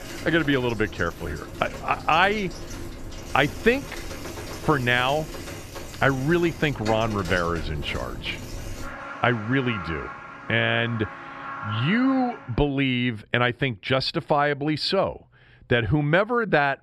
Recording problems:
traffic noise; noticeable; until 12 s; 15 dB below the speech

